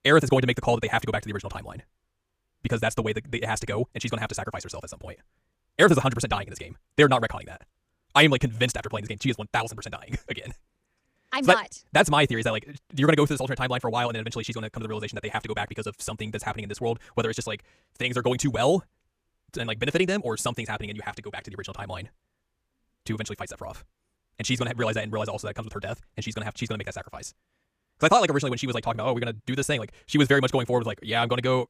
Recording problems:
wrong speed, natural pitch; too fast; 1.7 times normal speed

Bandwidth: 15 kHz